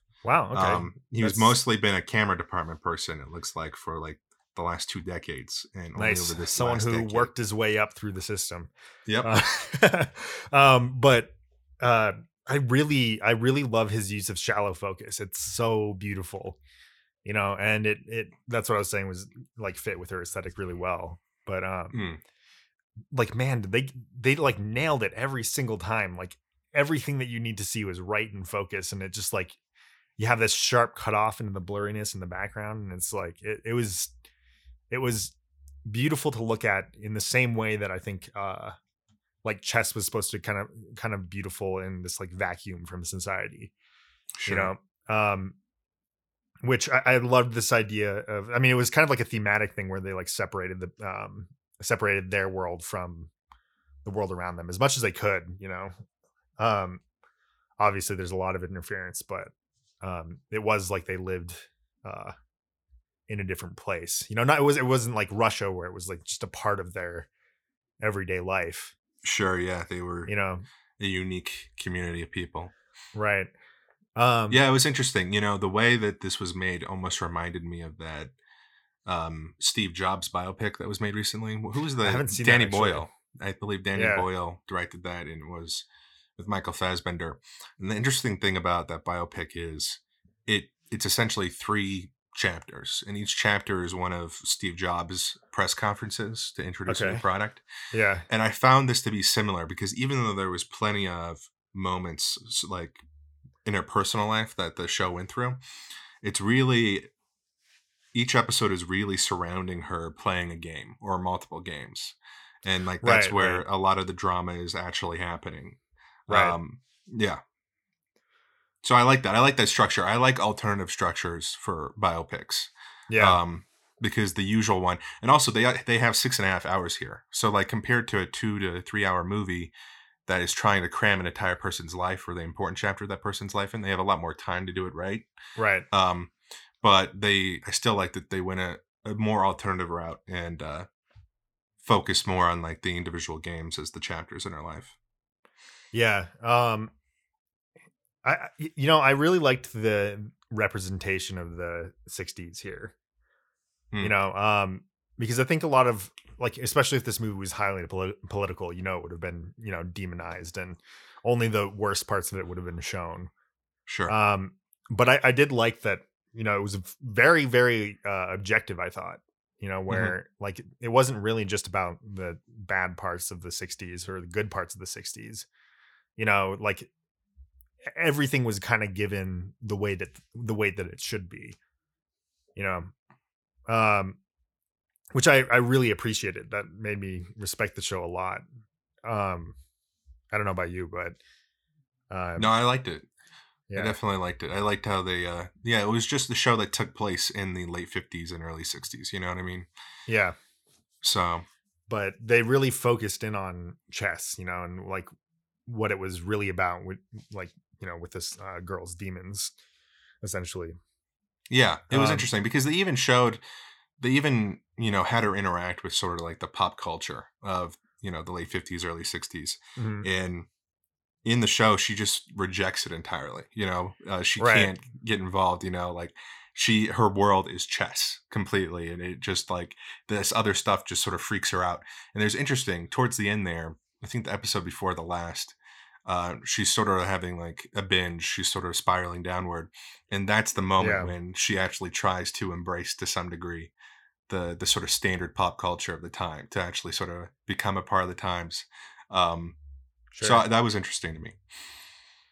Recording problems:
none

